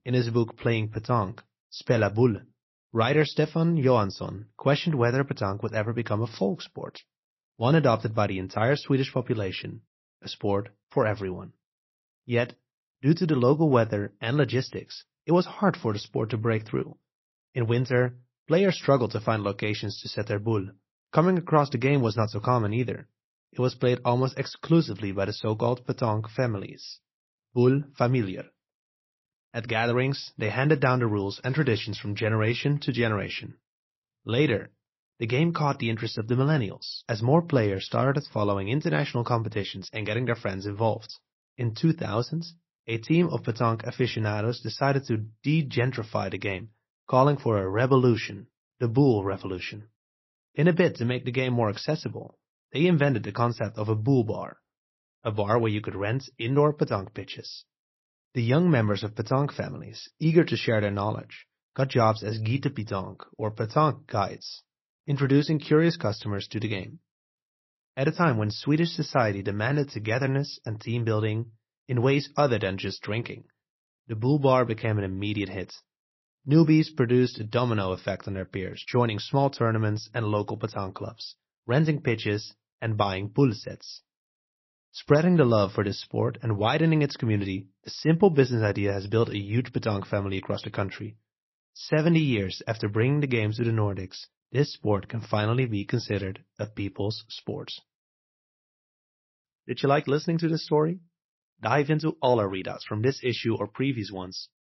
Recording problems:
garbled, watery; slightly; nothing above 5.5 kHz

